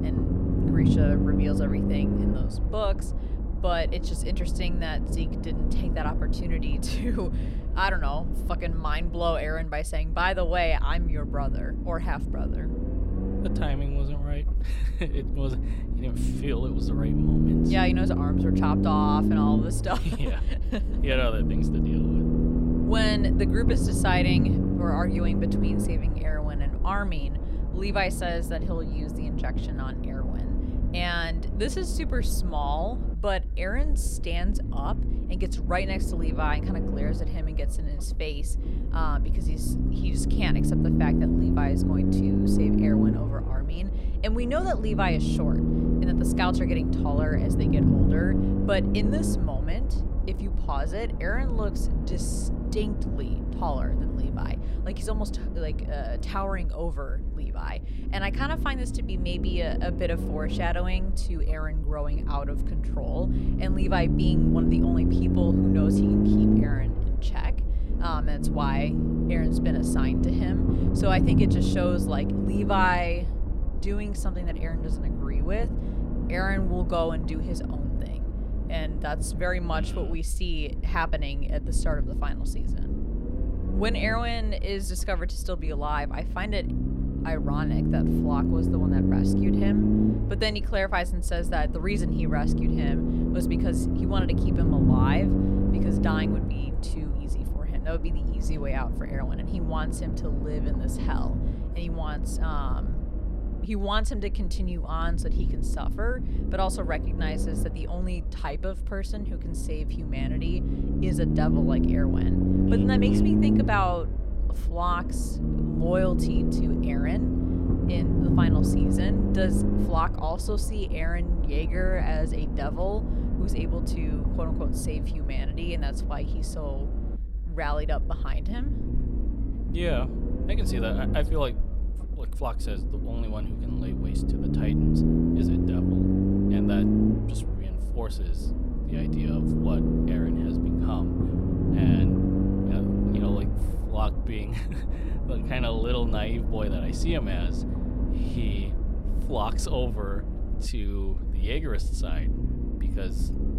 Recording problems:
low rumble; loud; throughout; 2 dB below the speech

